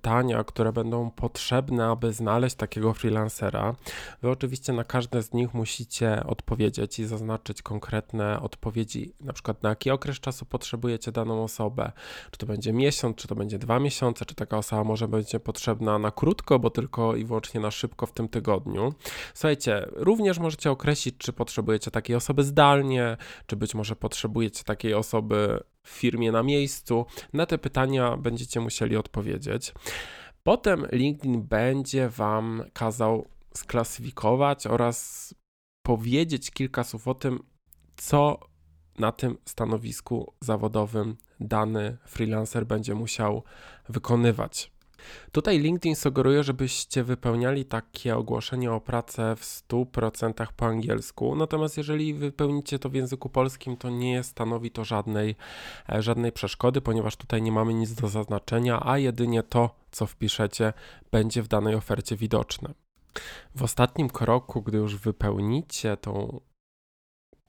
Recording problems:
none

